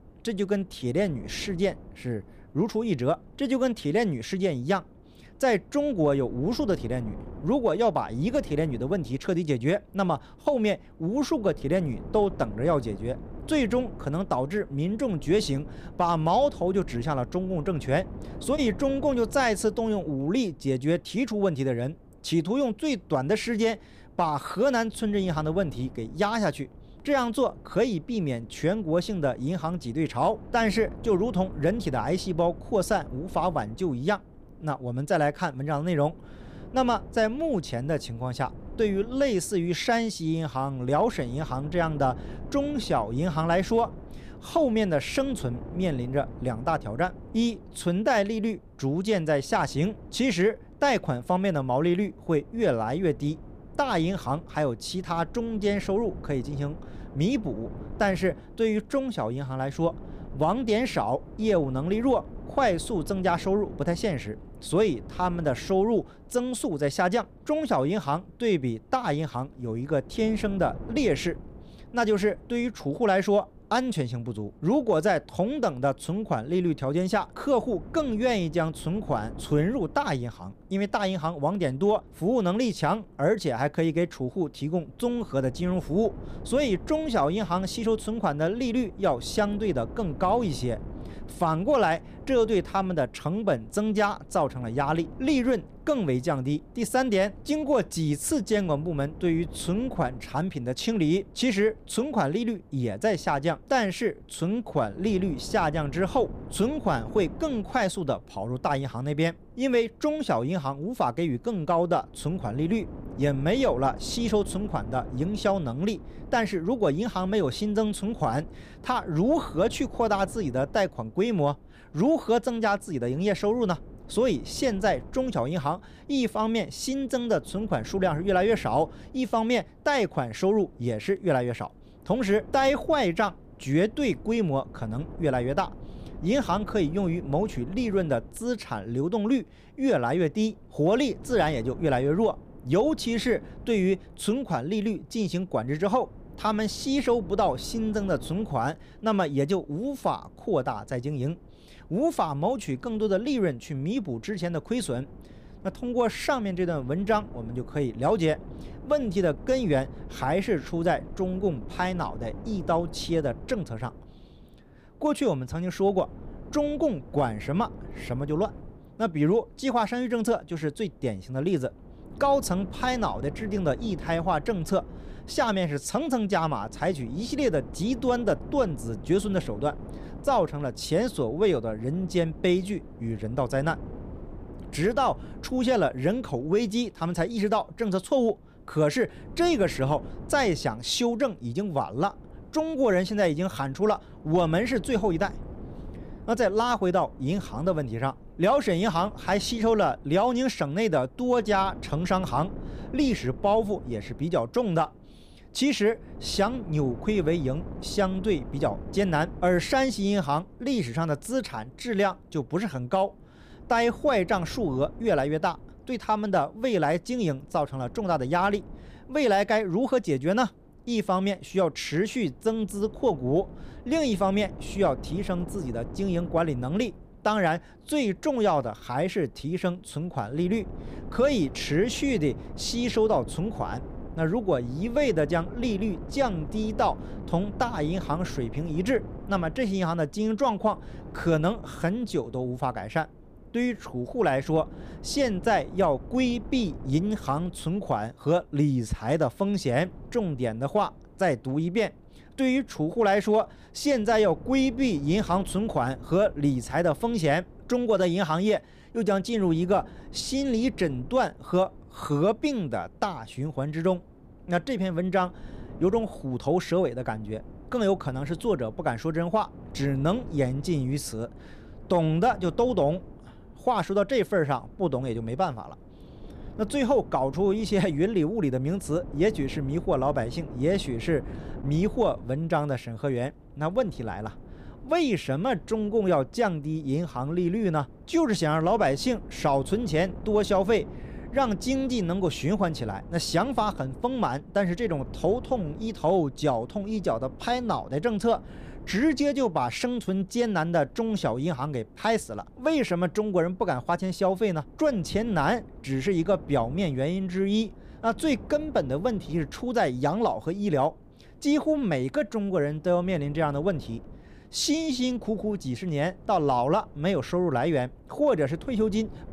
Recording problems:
wind noise on the microphone; occasional gusts; 20 dB below the speech

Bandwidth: 15 kHz